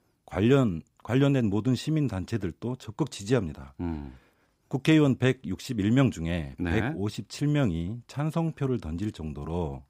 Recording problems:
none

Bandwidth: 15.5 kHz